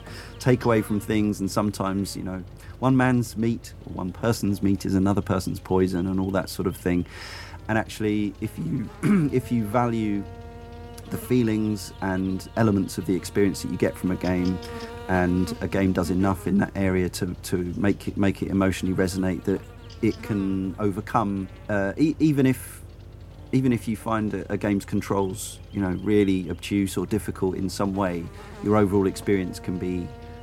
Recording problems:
electrical hum; noticeable; throughout; 50 Hz, 20 dB below the speech

